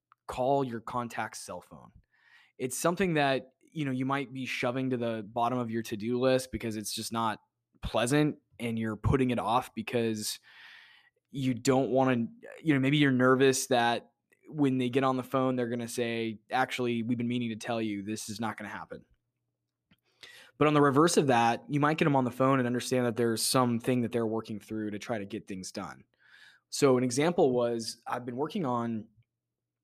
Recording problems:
none

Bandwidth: 14.5 kHz